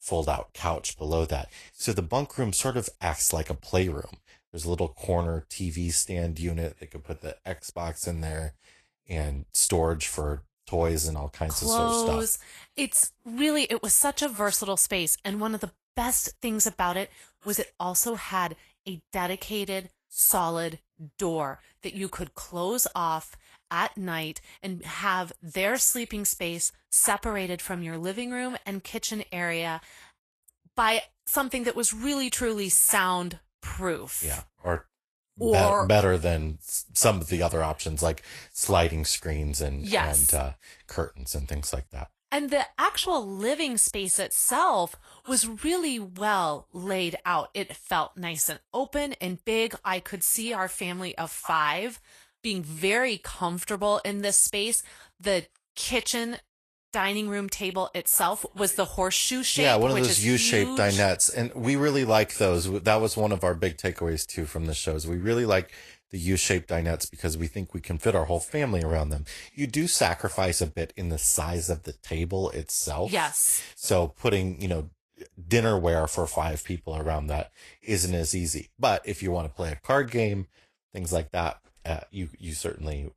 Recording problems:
garbled, watery; slightly; nothing above 12.5 kHz

